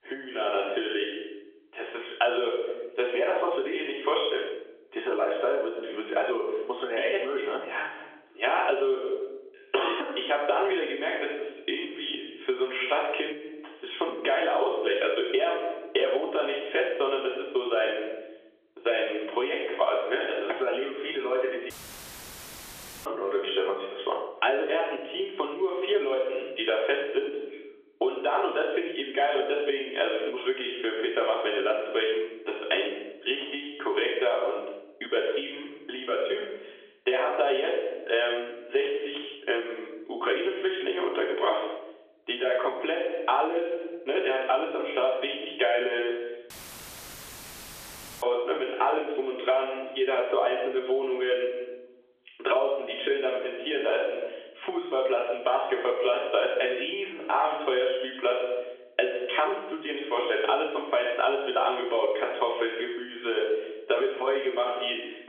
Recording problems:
off-mic speech; far
room echo; noticeable; dies away in 0.6 s
phone-call audio; nothing above 3.5 kHz
squashed, flat; somewhat
audio cutting out; filled with static; at 22 s for 1.5 s and at 47 s for 1.5 s

